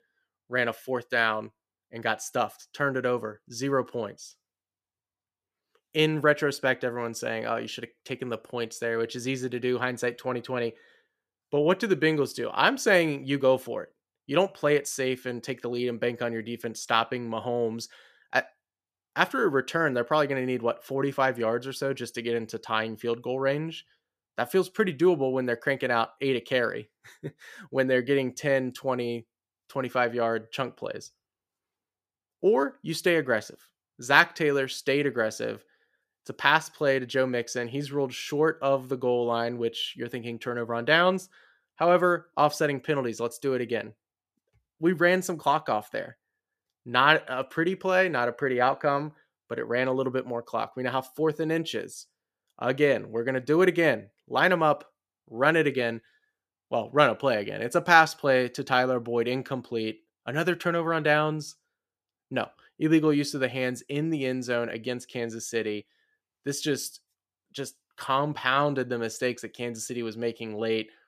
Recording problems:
none

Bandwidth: 14.5 kHz